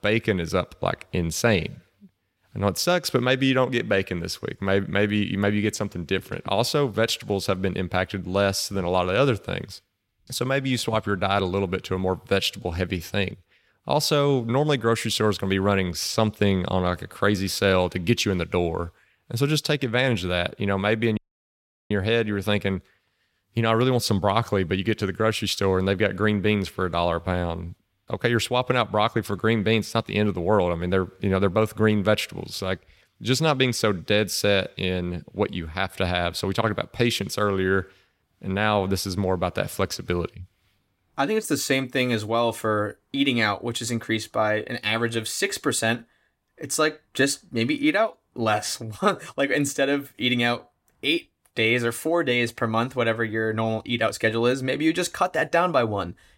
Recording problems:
audio cutting out; at 21 s for 0.5 s

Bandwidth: 16 kHz